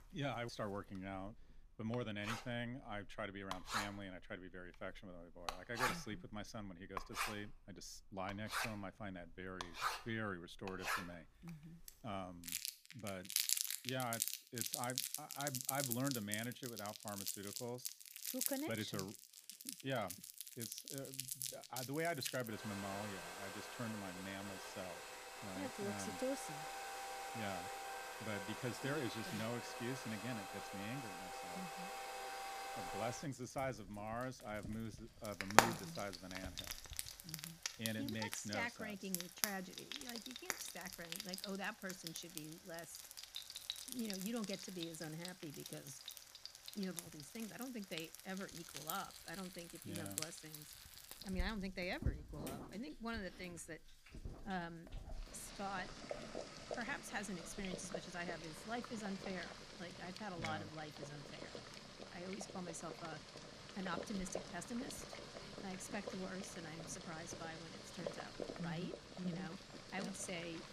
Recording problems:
household noises; very loud; throughout; 1 dB above the speech

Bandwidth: 15 kHz